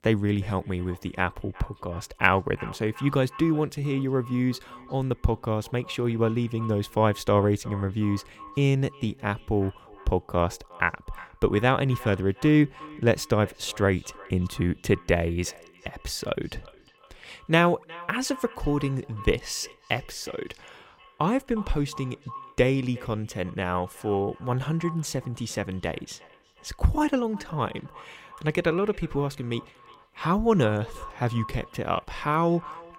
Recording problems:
echo of what is said; faint; throughout; 360 ms later, 20 dB below the speech

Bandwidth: 17.5 kHz